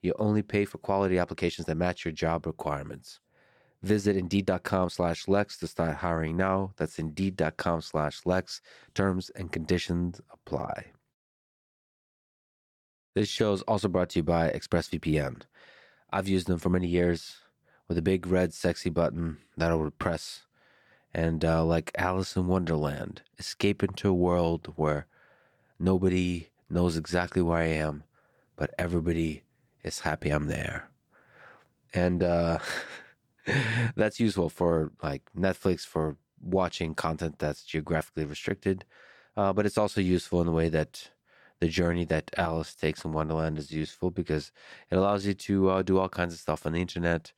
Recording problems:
uneven, jittery; strongly; from 1.5 to 44 s

